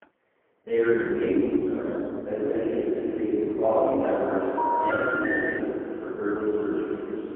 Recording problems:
phone-call audio; poor line
echo of what is said; strong; from 2.5 s on; 380 ms later, 7 dB below the speech
room echo; strong; dies away in 2.7 s
off-mic speech; far
muffled; very; fading above 3 kHz
jangling keys; very faint; at the start; peak 35 dB below the speech
phone ringing; loud; from 4.5 to 5.5 s; peak 2 dB above the speech

